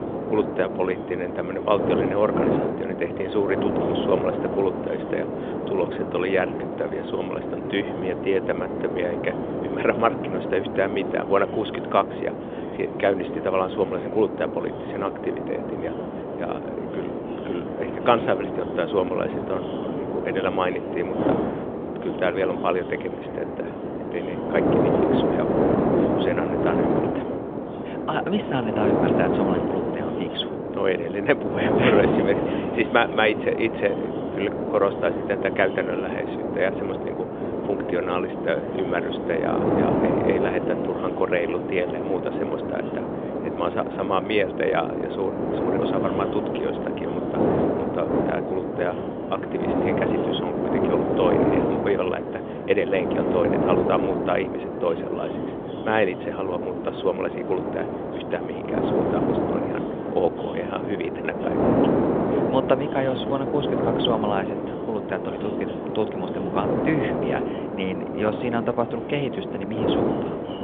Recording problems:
phone-call audio; nothing above 3.5 kHz
wind noise on the microphone; heavy; 2 dB below the speech
background chatter; noticeable; throughout; 4 voices, 20 dB below the speech

